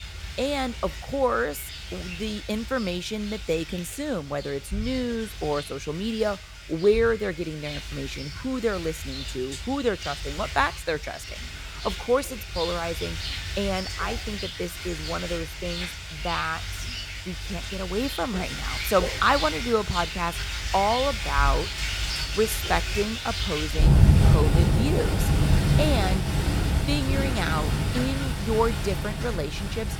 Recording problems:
rain or running water; very loud; throughout; as loud as the speech

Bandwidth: 18.5 kHz